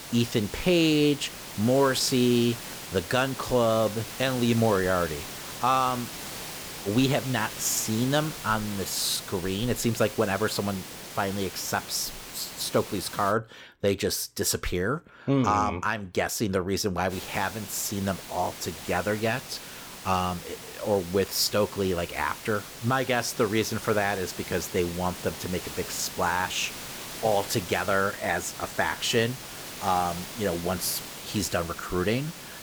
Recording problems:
hiss; noticeable; until 13 s and from 17 s on; 10 dB below the speech

